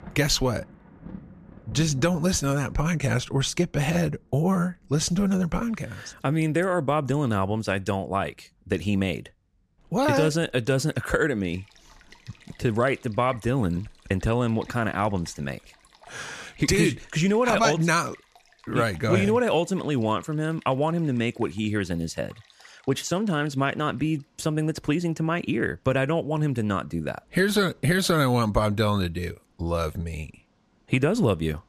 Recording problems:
rain or running water; faint; throughout; 25 dB below the speech

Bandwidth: 14.5 kHz